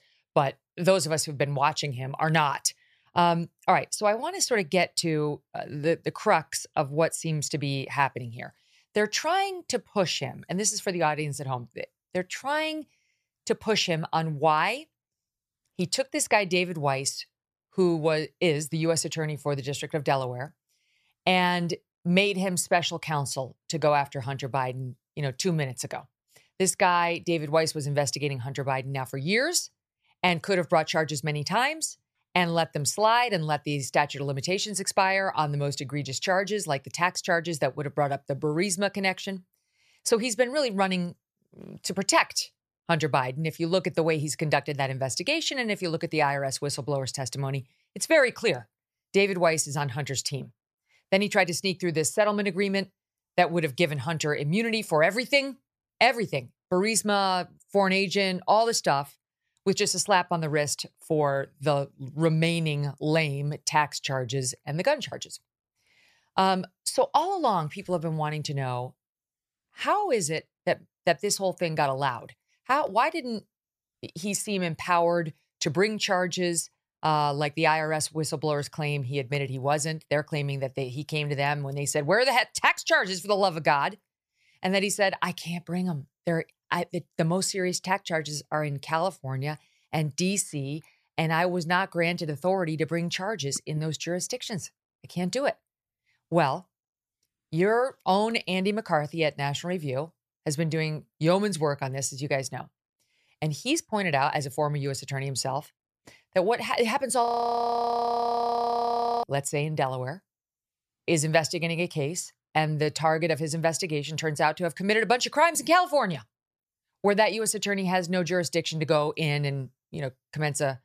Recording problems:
audio freezing; at 1:47 for 2 s

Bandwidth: 14.5 kHz